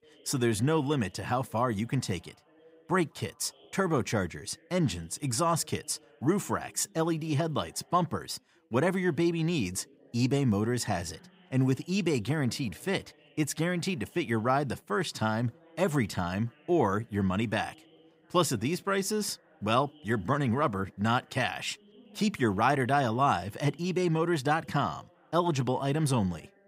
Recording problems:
background chatter; faint; throughout; 2 voices, 30 dB below the speech

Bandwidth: 15.5 kHz